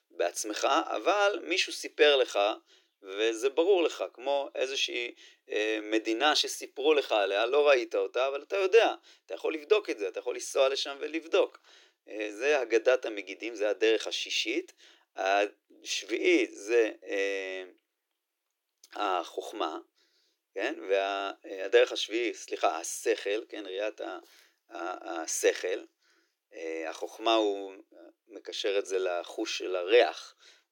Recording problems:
thin; very; fading below 300 Hz

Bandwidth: 18 kHz